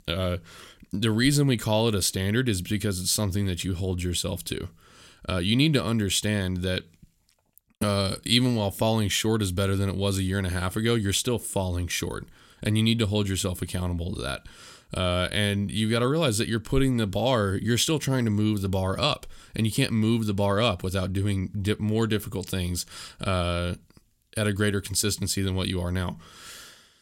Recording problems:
none

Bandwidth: 16.5 kHz